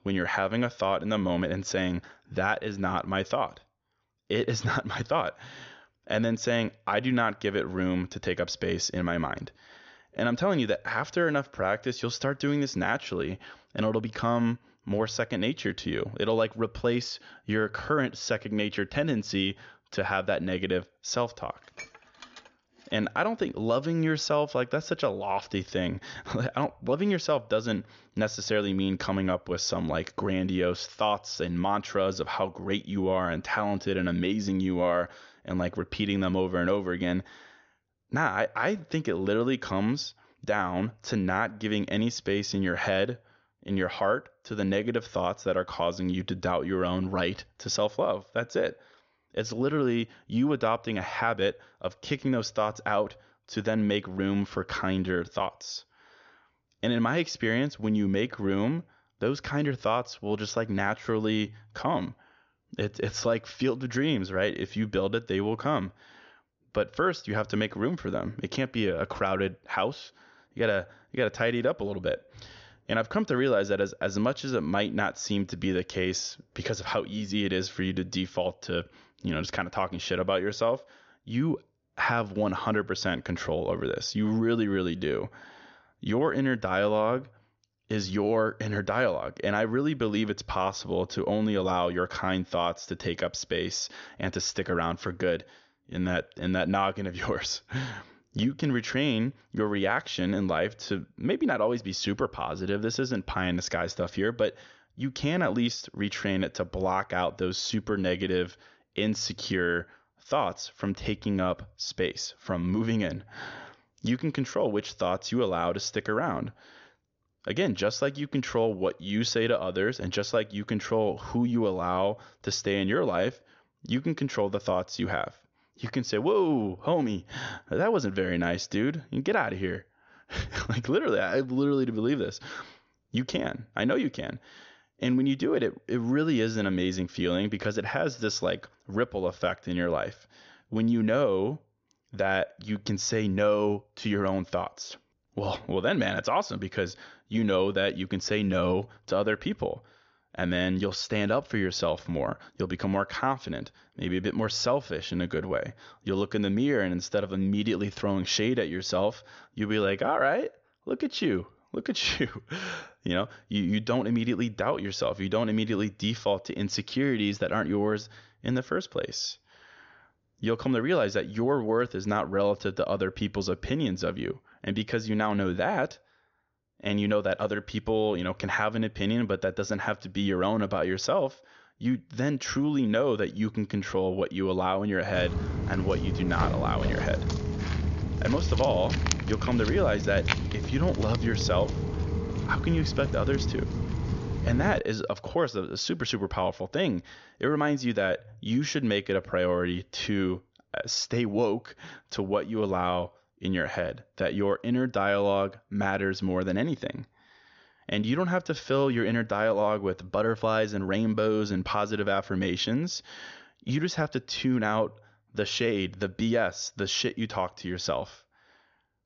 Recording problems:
high frequencies cut off; noticeable; nothing above 7 kHz
clattering dishes; faint; from 22 to 23 s; peak 15 dB below the speech
footsteps; loud; from 3:05 to 3:15; peak 1 dB above the speech

